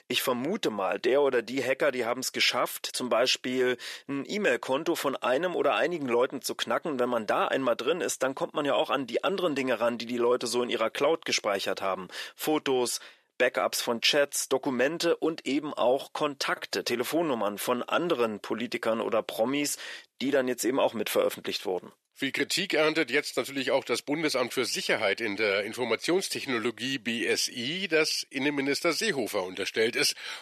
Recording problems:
thin; somewhat; fading below 400 Hz

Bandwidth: 13.5 kHz